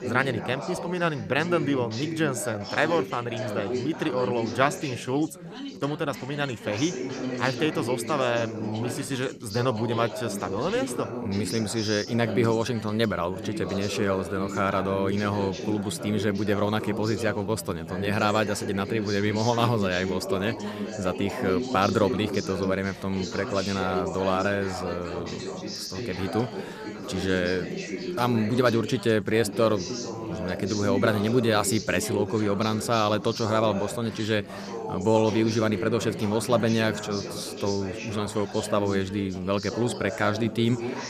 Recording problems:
background chatter; loud; throughout; 4 voices, 7 dB below the speech

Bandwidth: 14.5 kHz